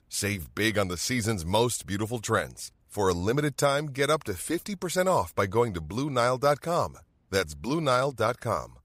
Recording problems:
none

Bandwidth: 15.5 kHz